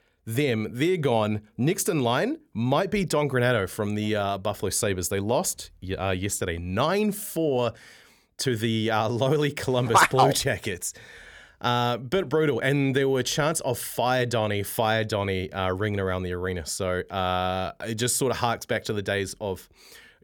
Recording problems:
none

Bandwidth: 18.5 kHz